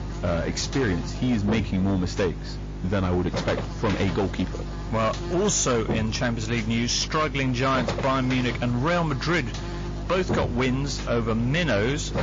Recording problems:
distortion; slight; 12% of the sound clipped
garbled, watery; slightly
electrical hum; noticeable; throughout; 50 Hz, 10 dB below the speech

